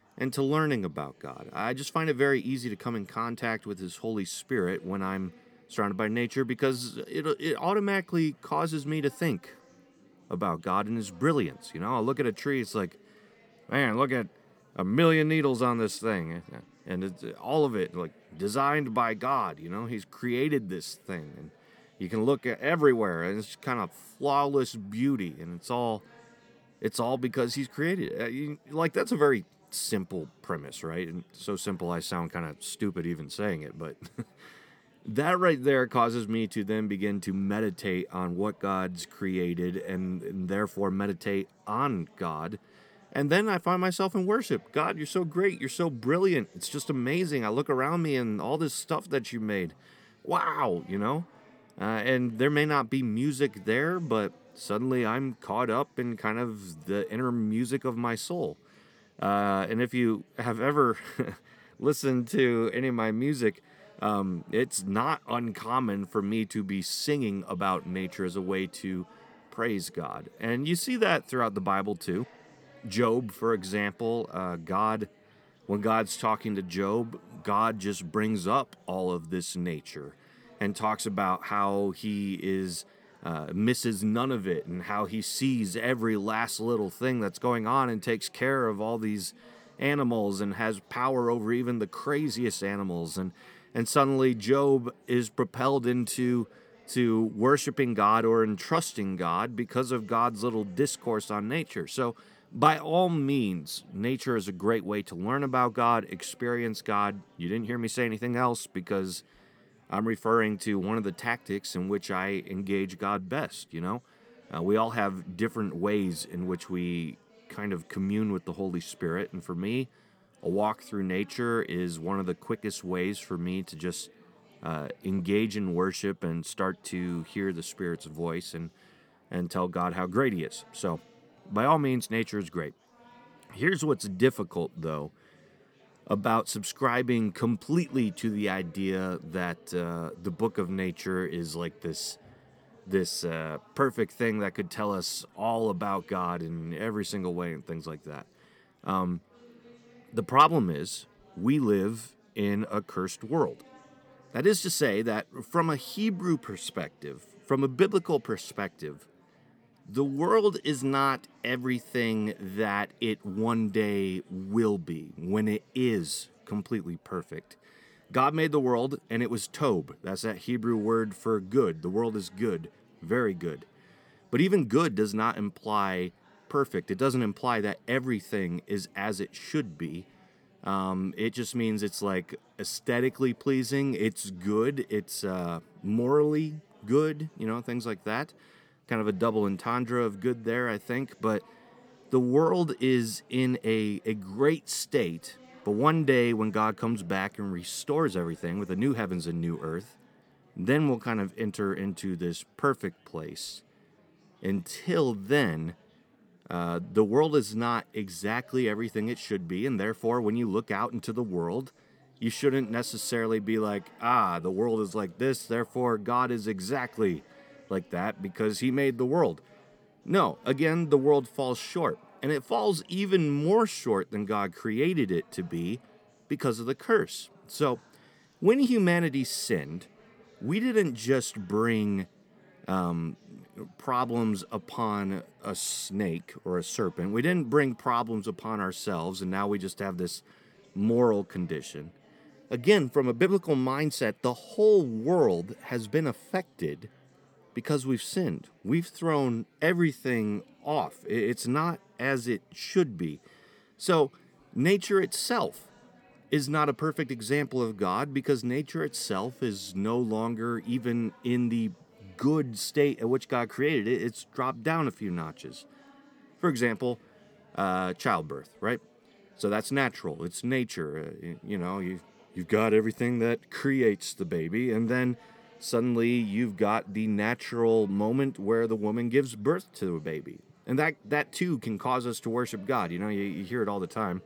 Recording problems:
chatter from many people; faint; throughout; 30 dB below the speech

